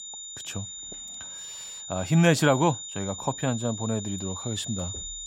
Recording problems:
high-pitched whine; loud; throughout; 7 kHz, 9 dB below the speech

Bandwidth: 16 kHz